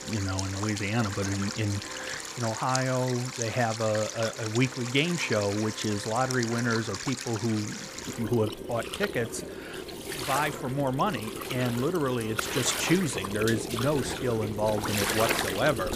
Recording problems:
rain or running water; loud; throughout; 5 dB below the speech
background music; noticeable; throughout; 20 dB below the speech

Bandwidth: 15 kHz